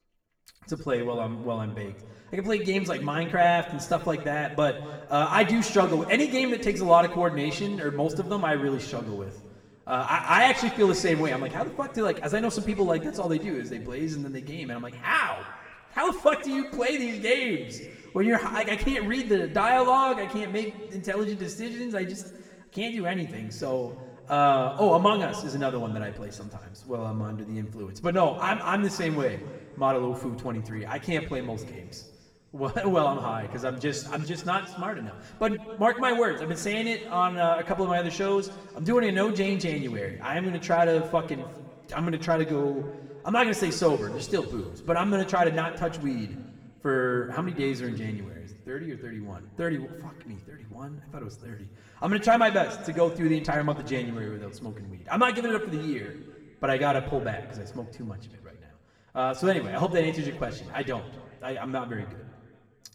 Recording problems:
room echo; slight; dies away in 1.4 s
off-mic speech; somewhat distant

